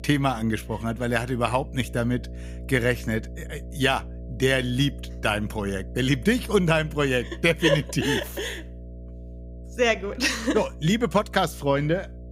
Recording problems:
electrical hum; faint; throughout; 60 Hz, 25 dB below the speech

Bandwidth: 15.5 kHz